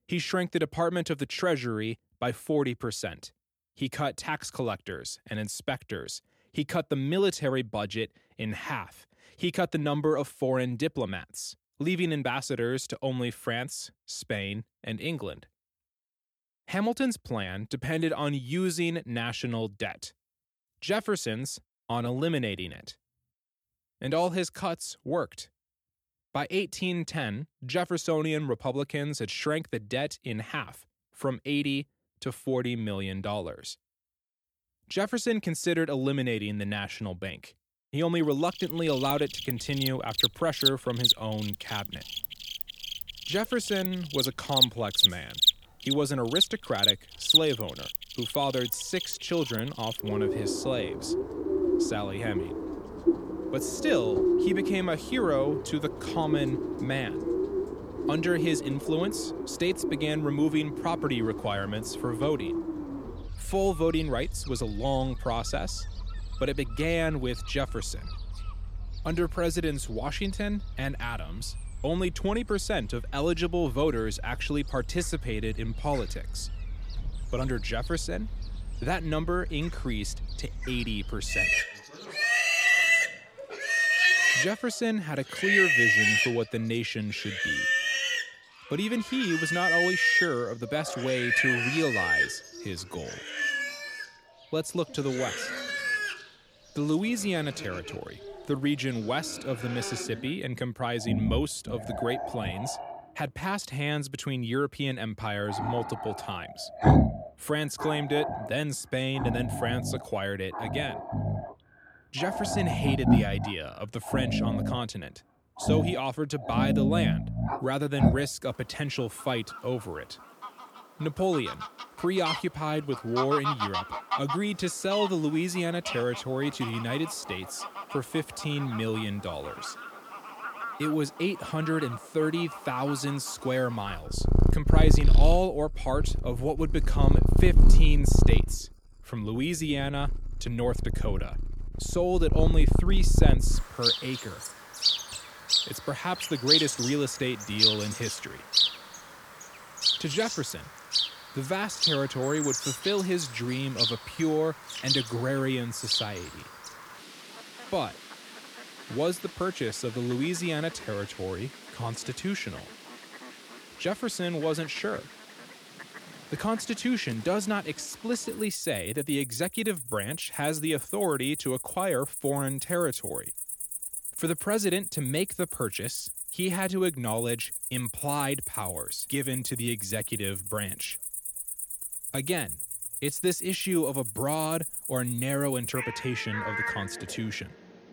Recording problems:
animal sounds; very loud; from 39 s on; 2 dB above the speech

